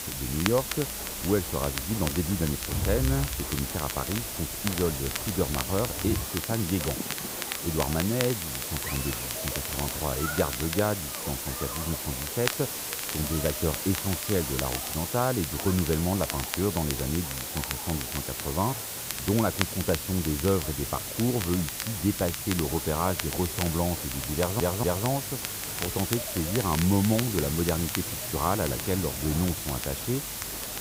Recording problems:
muffled; slightly; fading above 1.5 kHz
hiss; loud; throughout; 3 dB below the speech
crackle, like an old record; loud; 9 dB below the speech
crowd noise; noticeable; throughout; 10 dB below the speech
audio stuttering; at 24 s

